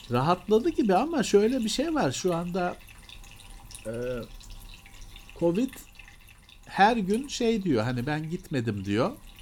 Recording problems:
household noises; faint; throughout; 20 dB below the speech

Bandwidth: 17 kHz